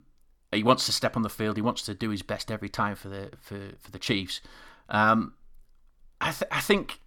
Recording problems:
none

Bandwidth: 17.5 kHz